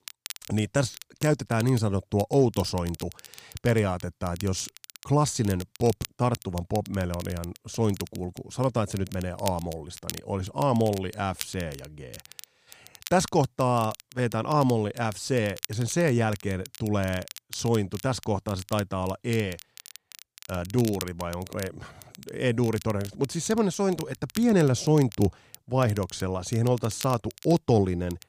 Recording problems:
crackle, like an old record; noticeable; 15 dB below the speech

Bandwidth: 15 kHz